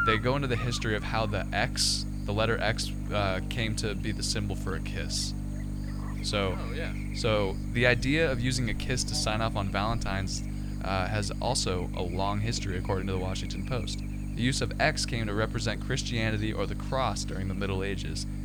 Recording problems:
electrical hum; noticeable; throughout; 50 Hz, 10 dB below the speech

